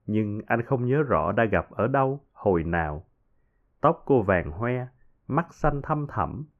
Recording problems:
muffled; very; fading above 2.5 kHz

